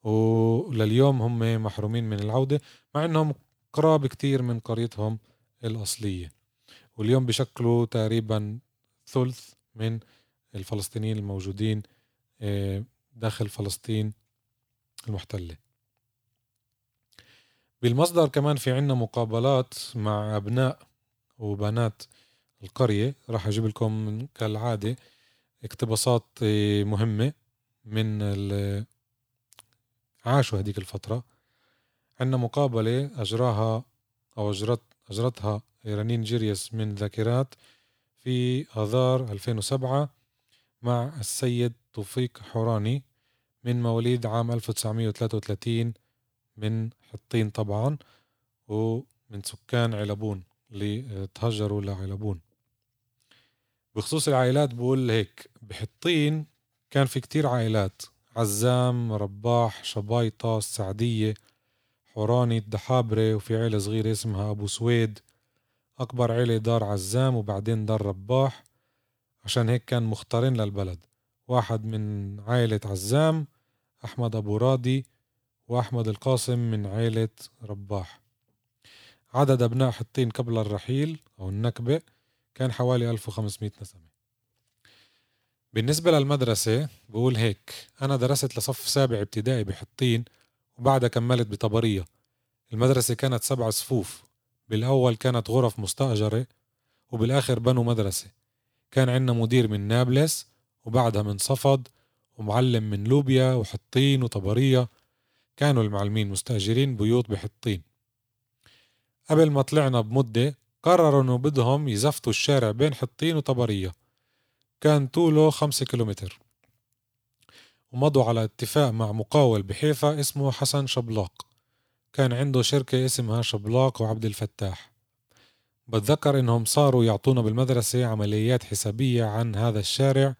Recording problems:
none

